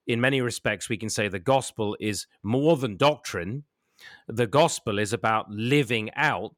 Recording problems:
none

